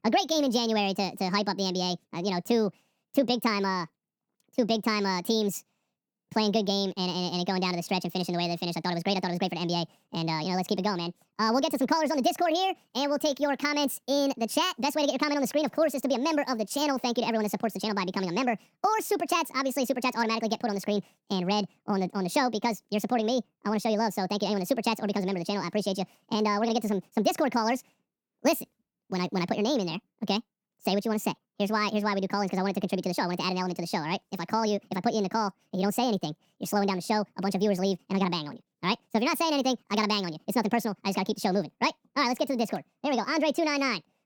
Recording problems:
wrong speed and pitch; too fast and too high; 1.7 times normal speed

